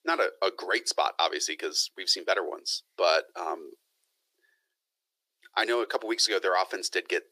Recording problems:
thin; very; fading below 350 Hz

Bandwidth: 15 kHz